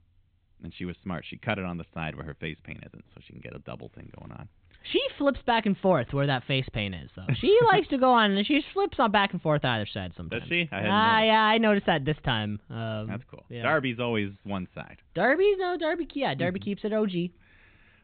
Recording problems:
high frequencies cut off; severe; nothing above 4 kHz

